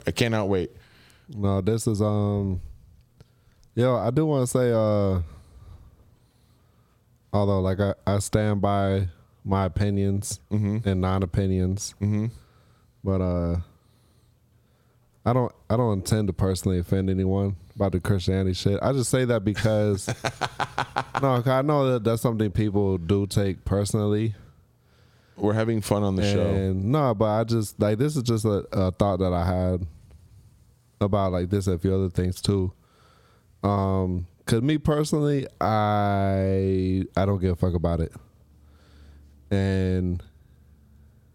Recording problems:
squashed, flat; somewhat

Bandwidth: 16.5 kHz